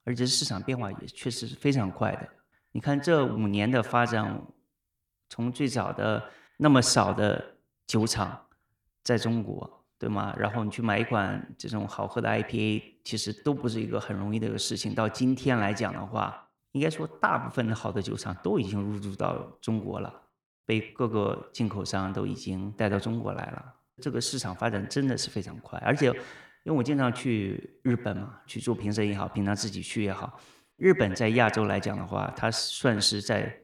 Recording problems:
echo of what is said; noticeable; throughout; 100 ms later, 15 dB below the speech

